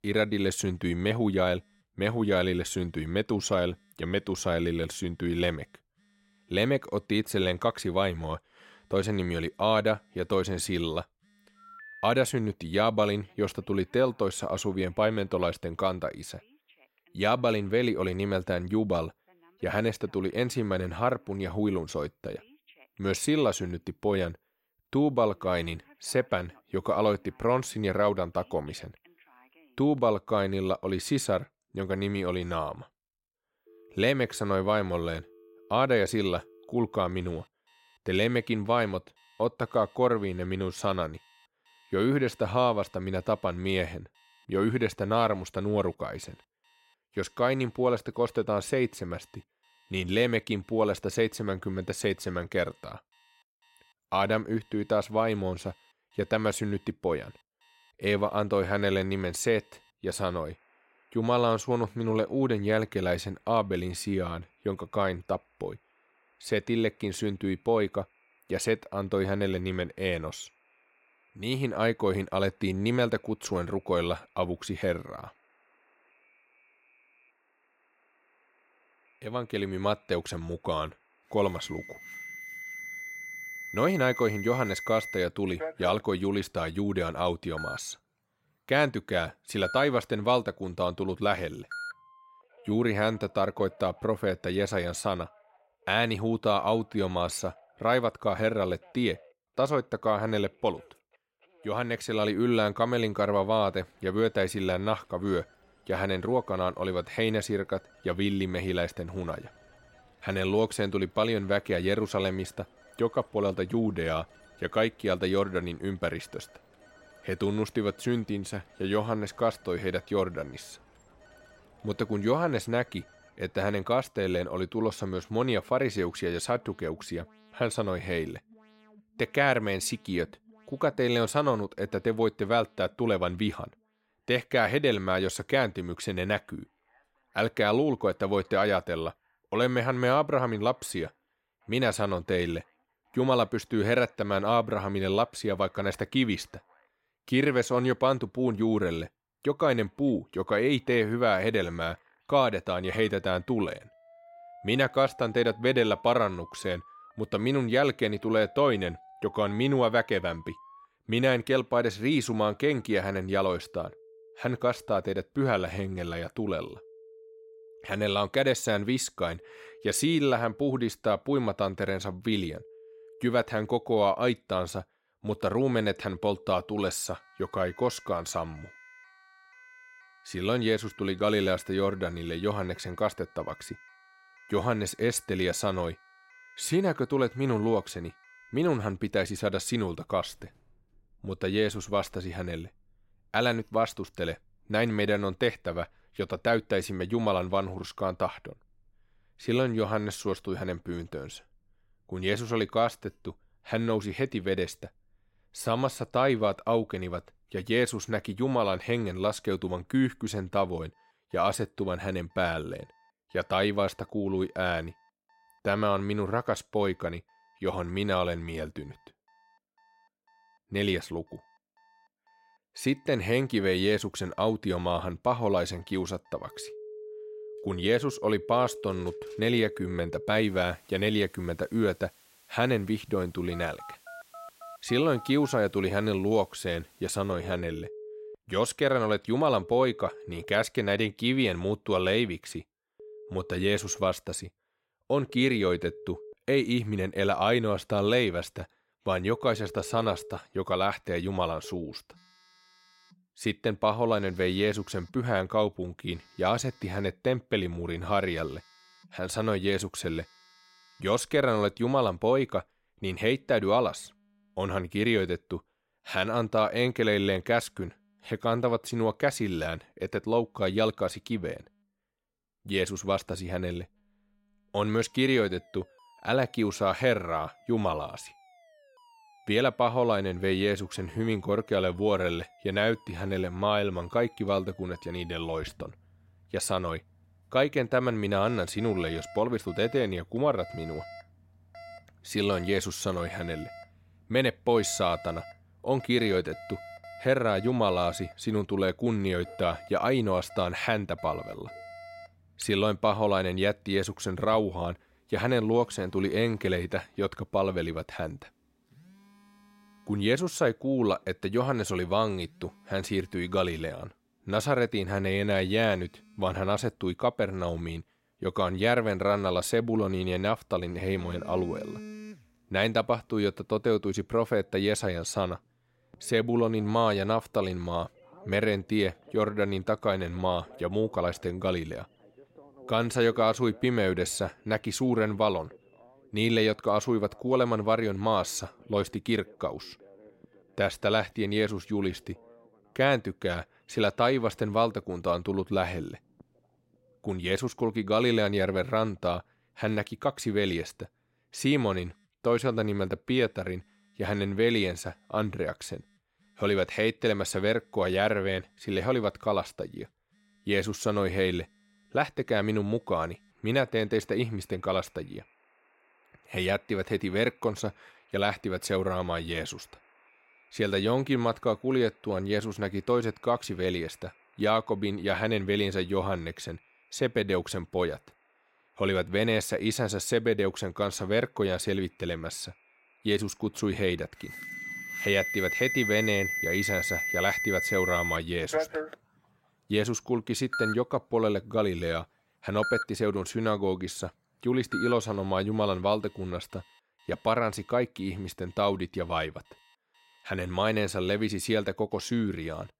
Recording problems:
alarms or sirens; noticeable; throughout; 10 dB below the speech

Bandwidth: 16 kHz